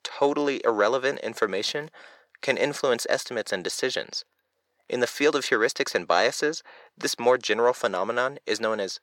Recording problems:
thin; somewhat; fading below 400 Hz

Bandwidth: 18.5 kHz